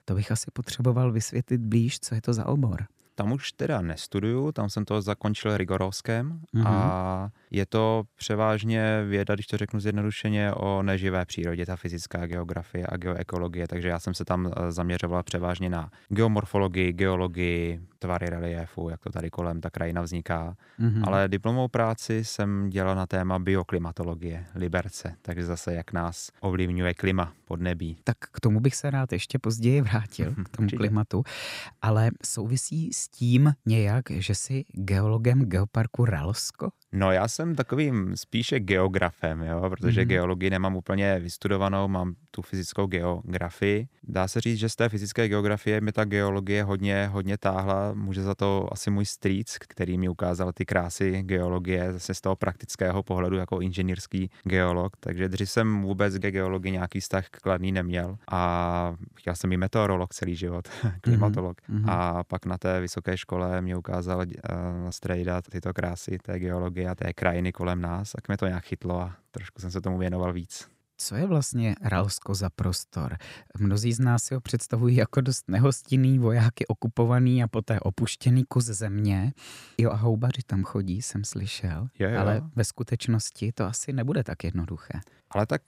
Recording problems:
none

